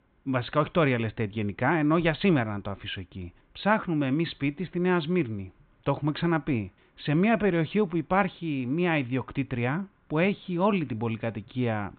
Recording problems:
high frequencies cut off; severe; nothing above 4 kHz

